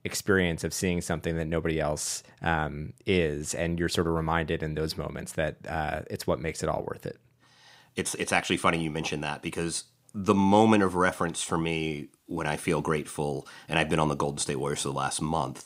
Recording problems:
none

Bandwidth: 15.5 kHz